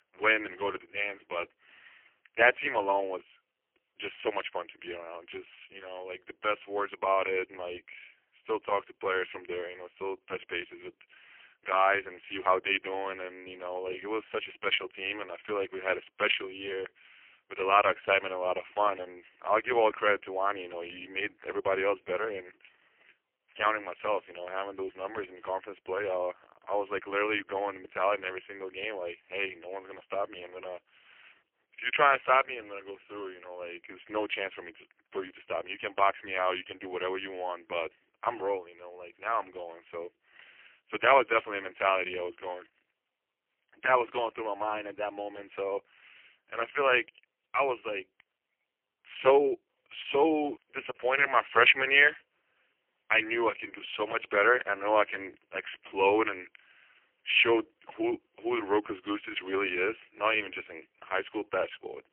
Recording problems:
phone-call audio; poor line; nothing above 3 kHz
thin; very; fading below 300 Hz

